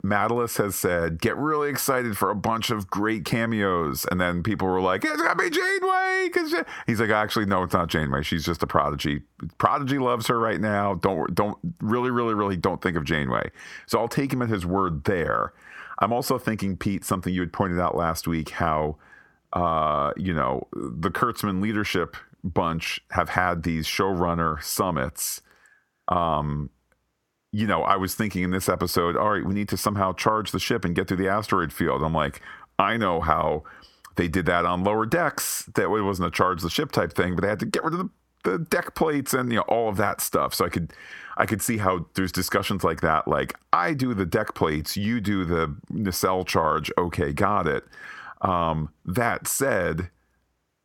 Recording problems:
squashed, flat; heavily

